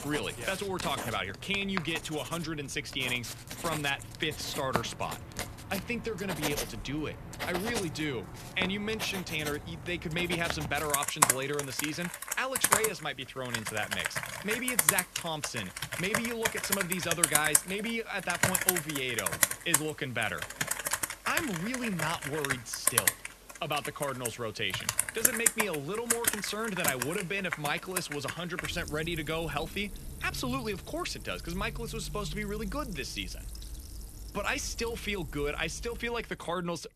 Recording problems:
household noises; very loud; throughout; 2 dB above the speech

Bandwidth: 14 kHz